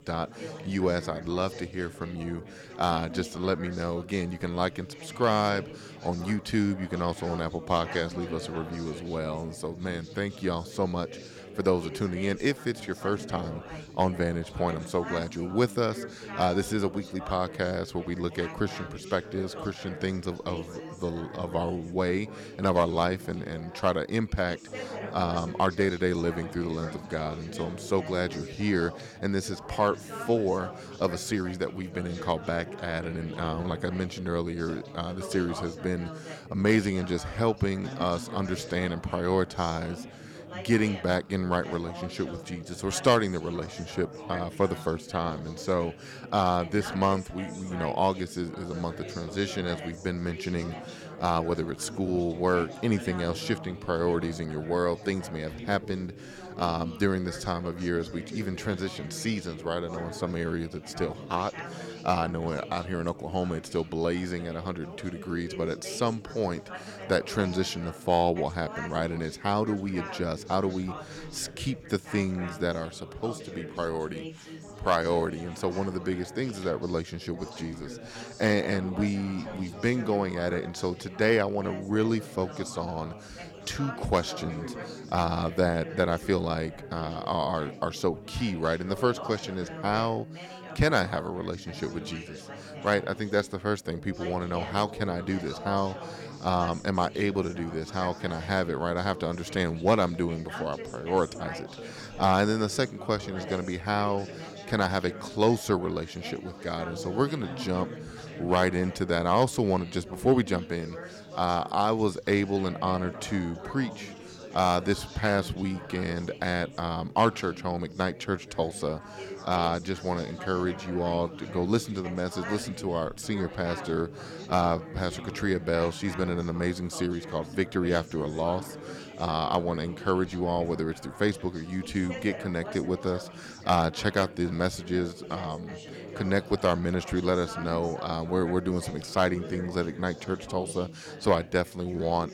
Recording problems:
chatter from many people; noticeable; throughout; 10 dB below the speech

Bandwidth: 17 kHz